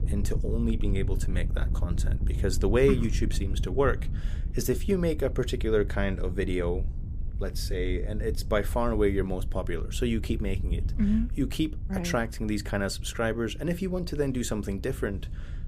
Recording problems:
wind noise on the microphone; occasional gusts; 15 dB below the speech

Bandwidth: 15 kHz